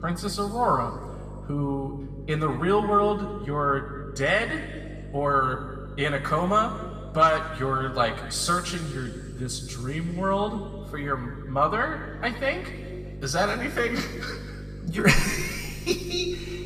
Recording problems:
room echo; noticeable; dies away in 1.8 s
off-mic speech; somewhat distant
electrical hum; faint; throughout; 50 Hz, 25 dB below the speech

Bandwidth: 14.5 kHz